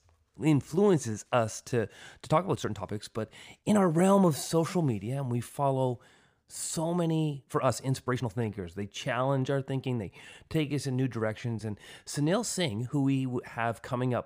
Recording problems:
uneven, jittery; strongly; from 0.5 to 13 s

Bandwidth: 15 kHz